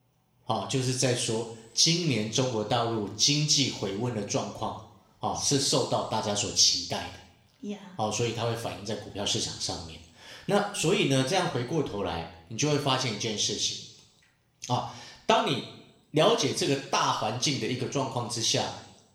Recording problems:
room echo; slight; dies away in 0.7 s
off-mic speech; somewhat distant

